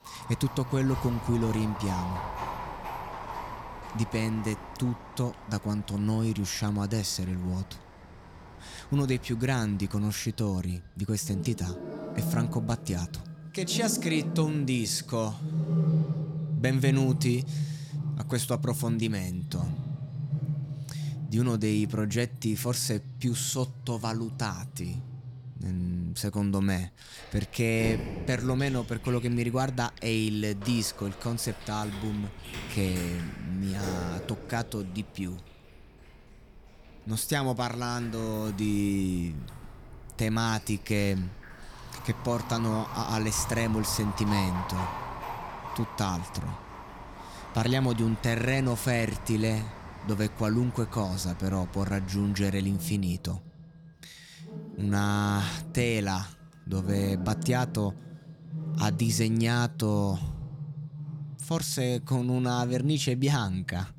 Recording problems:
animal sounds; loud; throughout; 8 dB below the speech

